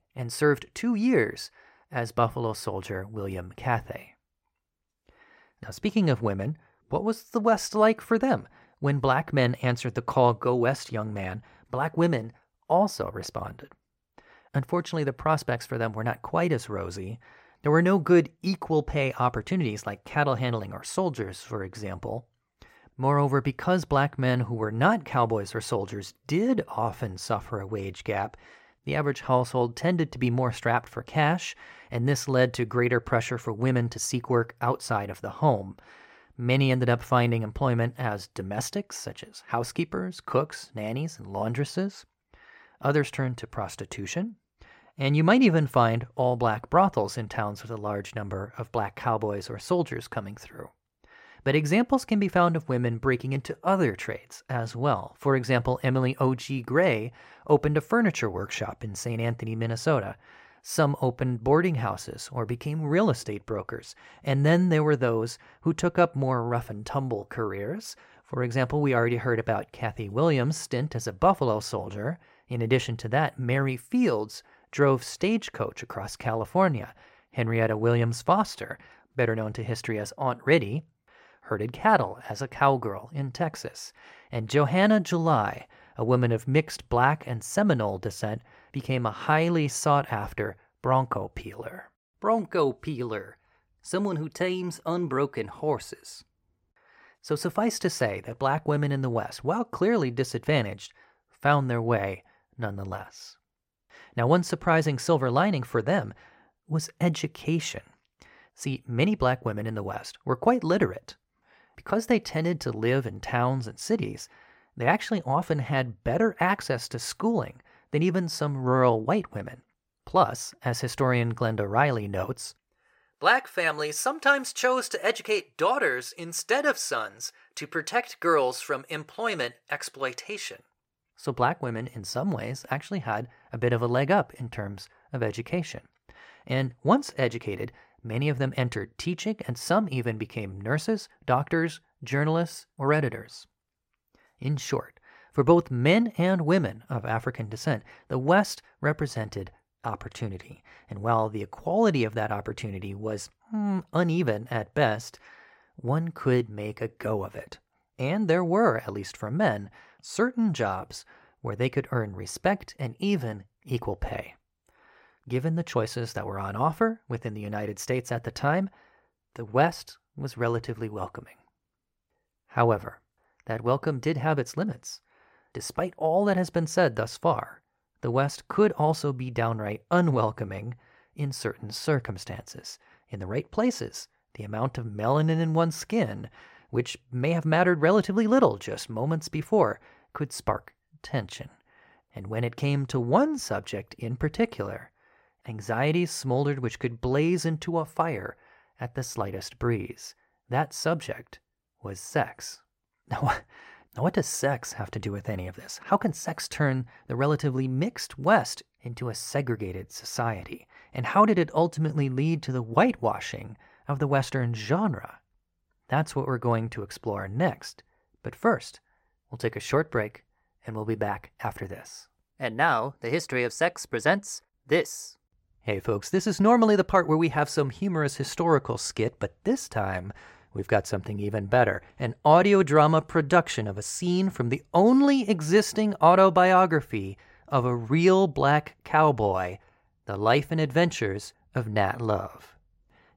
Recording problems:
none

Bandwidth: 16 kHz